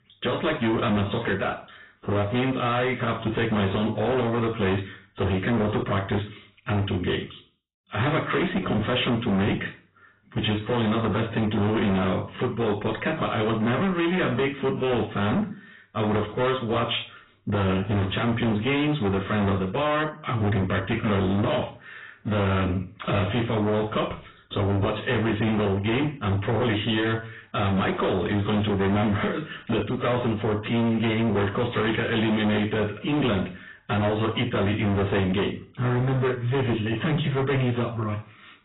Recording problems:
distortion; heavy; 24% of the sound clipped
garbled, watery; badly; nothing above 4 kHz
room echo; very slight; dies away in 0.4 s
off-mic speech; somewhat distant

